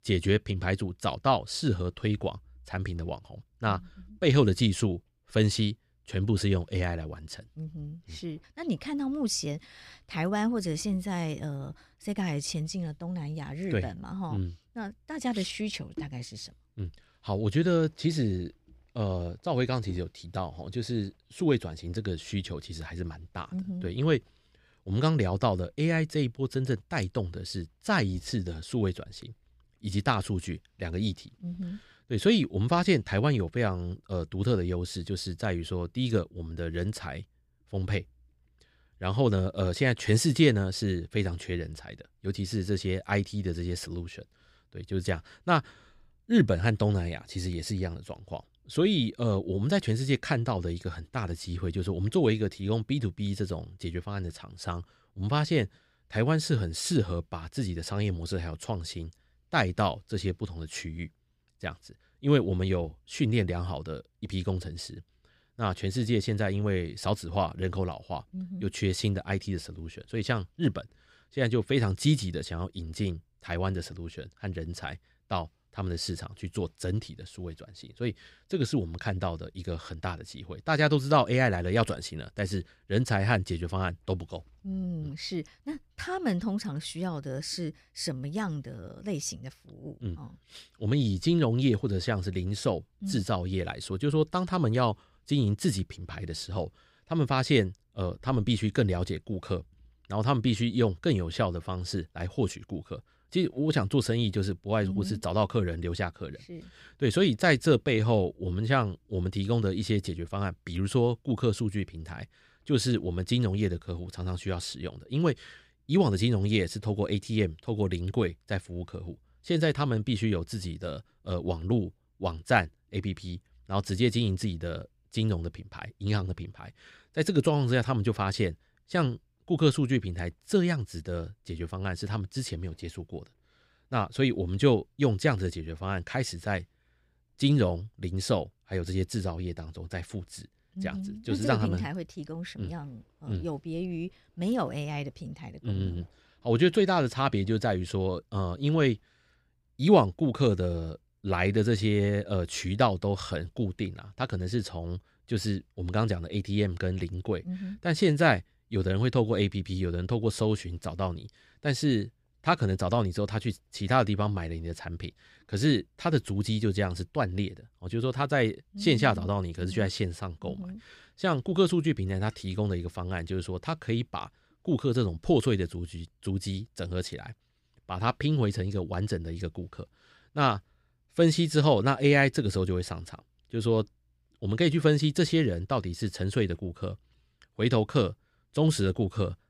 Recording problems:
none

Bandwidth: 15.5 kHz